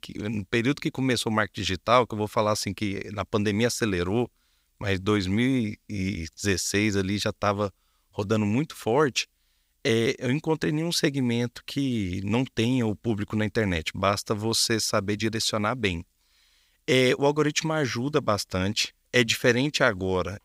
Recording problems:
none

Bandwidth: 15.5 kHz